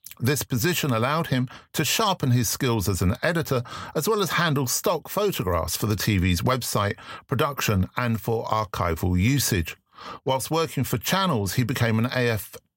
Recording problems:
none

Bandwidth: 16 kHz